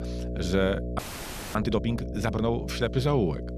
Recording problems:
electrical hum; noticeable; throughout; 60 Hz, 10 dB below the speech
audio freezing; at 1 s for 0.5 s

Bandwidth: 14 kHz